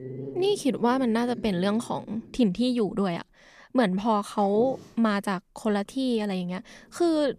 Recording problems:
animal sounds; noticeable; throughout; 15 dB below the speech

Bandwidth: 14.5 kHz